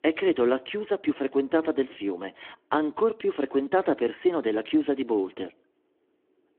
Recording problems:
phone-call audio

